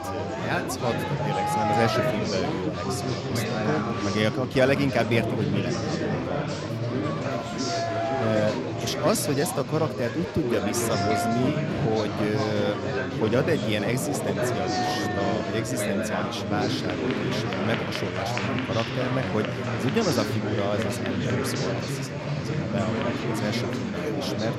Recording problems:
chatter from many people; very loud; throughout; 1 dB above the speech

